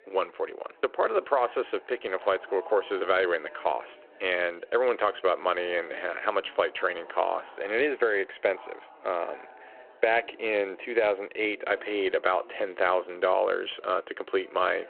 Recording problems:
phone-call audio
chatter from many people; faint; throughout; 20 dB below the speech

